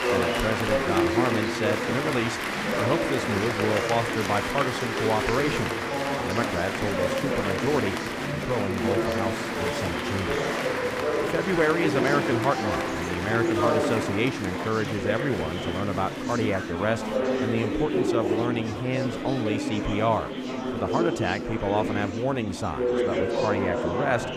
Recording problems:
murmuring crowd; very loud; throughout; 1 dB above the speech

